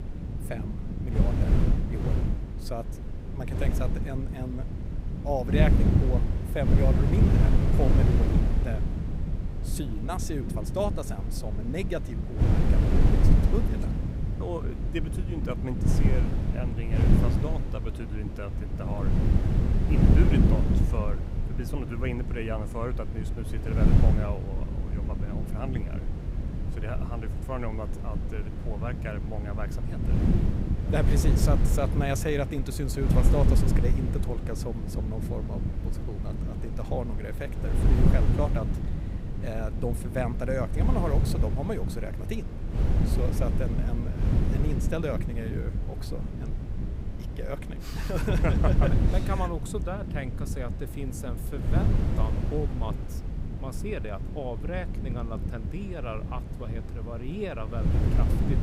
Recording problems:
wind noise on the microphone; heavy; 2 dB below the speech

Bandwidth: 15.5 kHz